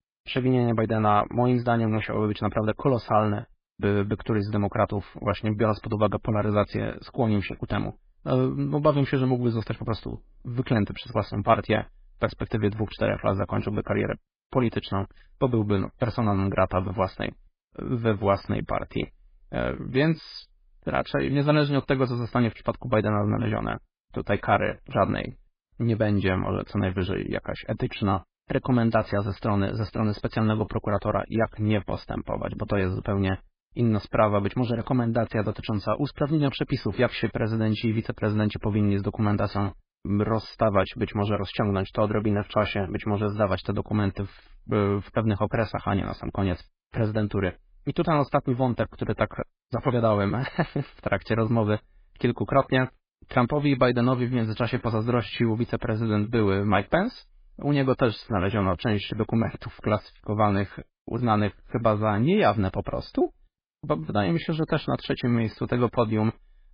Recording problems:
garbled, watery; badly; nothing above 5 kHz

